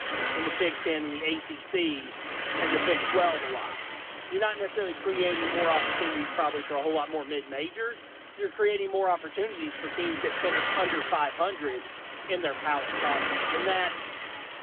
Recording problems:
phone-call audio; nothing above 3.5 kHz
traffic noise; loud; throughout; 1 dB below the speech

